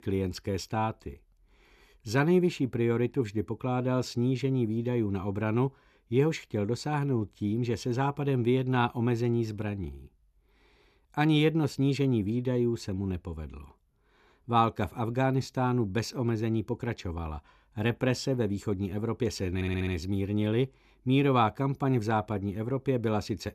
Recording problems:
audio stuttering; at 20 s

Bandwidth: 14 kHz